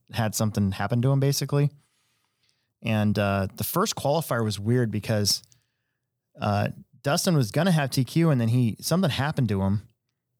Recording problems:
none

